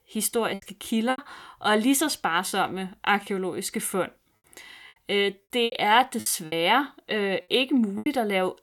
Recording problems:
choppy; very; 8% of the speech affected

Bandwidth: 18 kHz